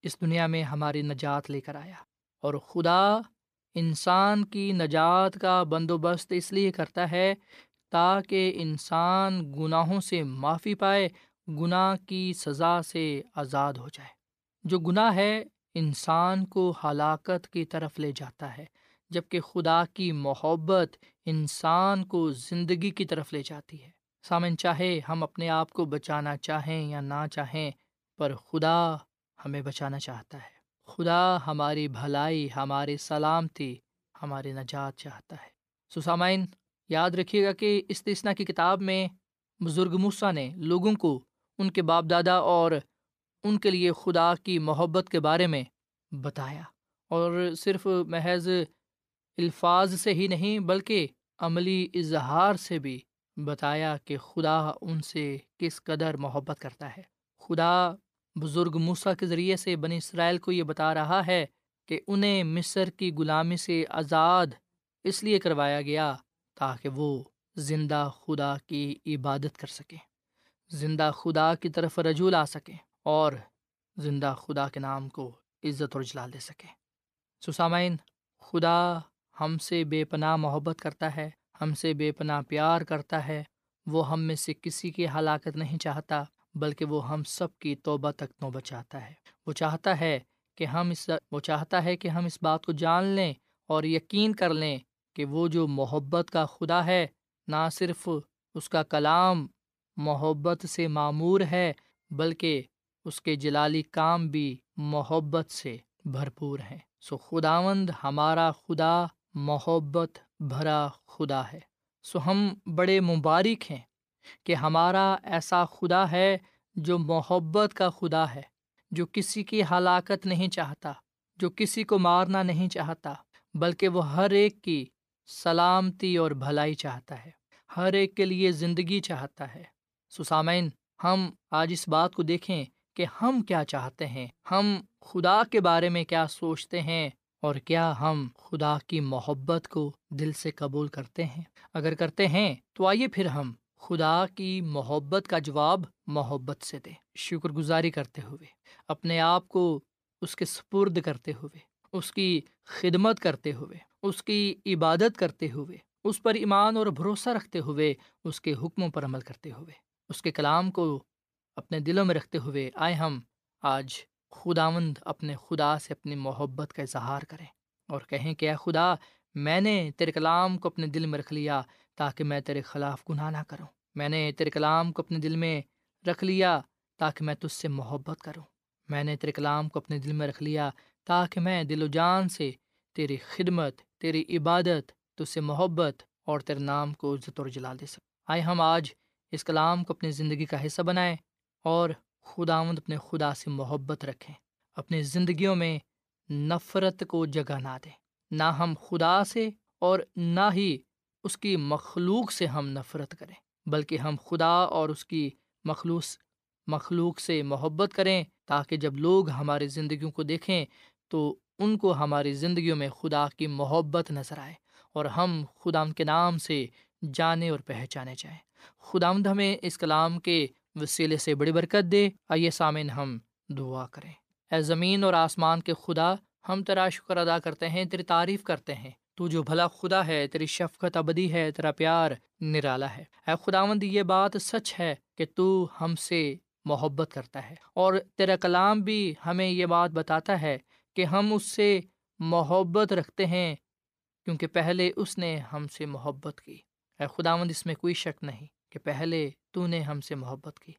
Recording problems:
none

